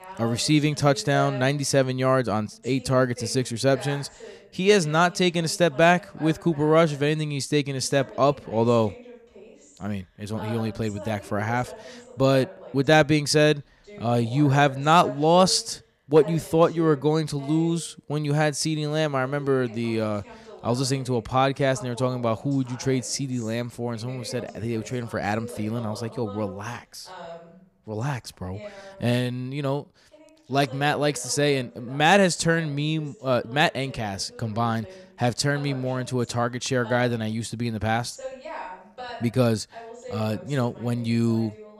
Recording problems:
voice in the background; noticeable; throughout; 20 dB below the speech

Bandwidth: 15 kHz